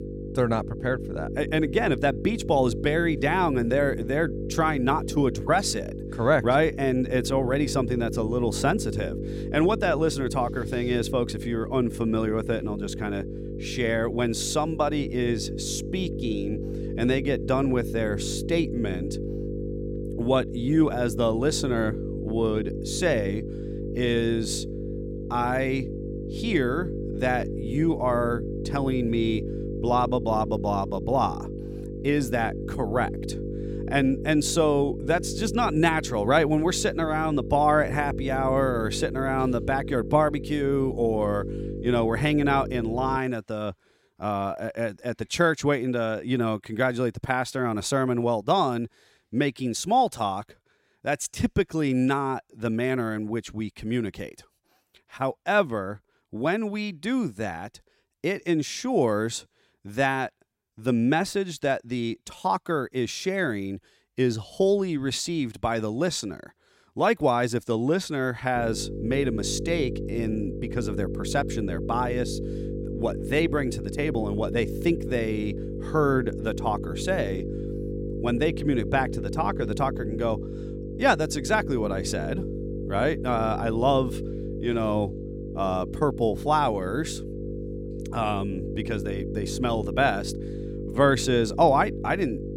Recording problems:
electrical hum; noticeable; until 43 s and from 1:09 on; 50 Hz, 10 dB below the speech

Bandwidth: 16 kHz